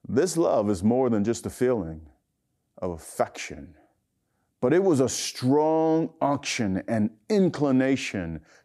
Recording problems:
none

